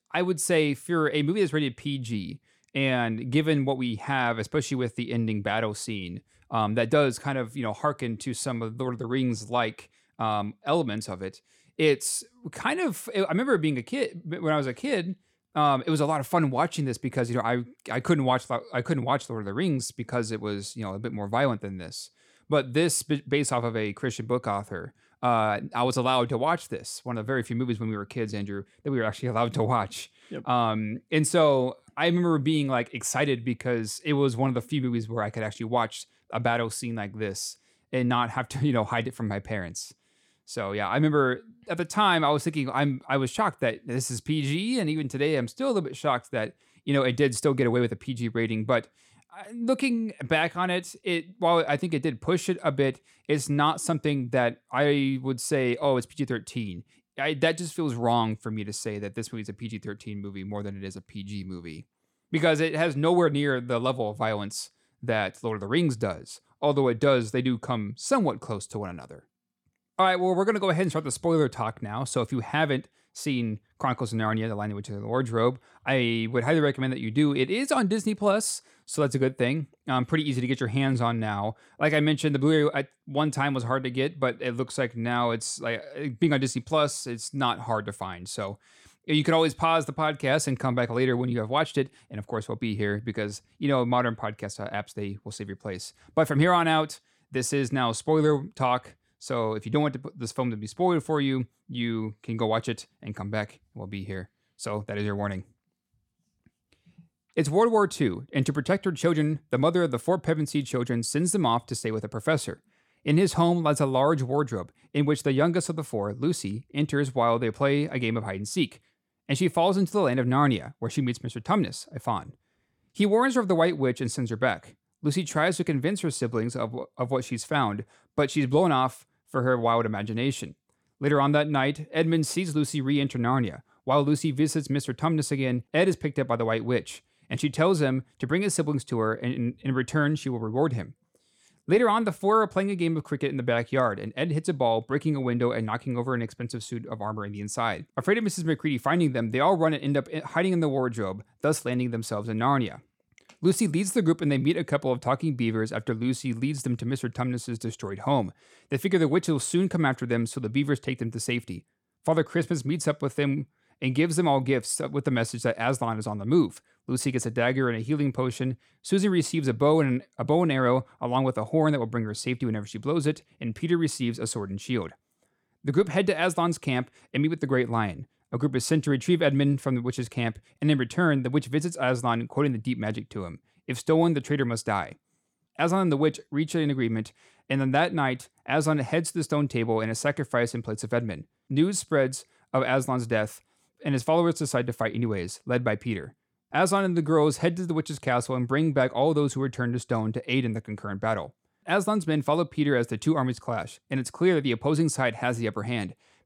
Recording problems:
none

